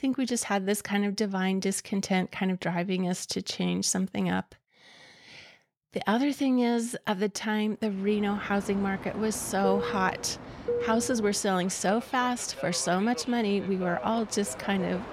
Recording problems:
train or aircraft noise; loud; from 8 s on; 10 dB below the speech

